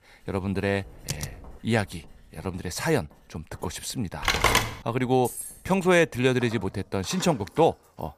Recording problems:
household noises; faint; throughout; 25 dB below the speech
keyboard typing; noticeable; at 1 s; peak 8 dB below the speech
phone ringing; loud; at 4 s; peak 5 dB above the speech
jangling keys; noticeable; at 5 s; peak 9 dB below the speech

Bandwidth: 14.5 kHz